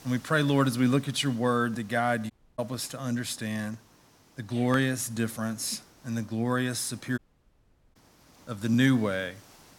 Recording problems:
hiss; faint; throughout; 25 dB below the speech
audio cutting out; at 2.5 s and at 7 s for 1 s

